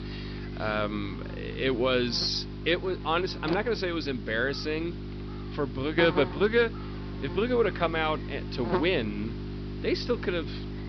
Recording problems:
high frequencies cut off; noticeable; nothing above 5.5 kHz
electrical hum; noticeable; throughout; 50 Hz, 10 dB below the speech

